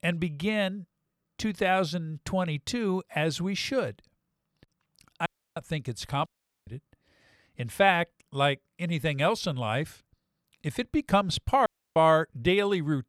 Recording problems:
audio cutting out; at 5.5 s, at 6.5 s and at 12 s

